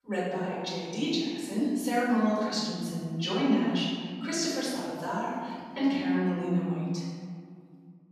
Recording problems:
room echo; strong; dies away in 1.8 s
off-mic speech; far

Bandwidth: 14 kHz